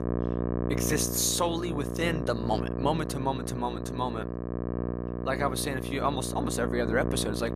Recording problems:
electrical hum; loud; throughout; 60 Hz, 6 dB below the speech

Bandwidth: 14.5 kHz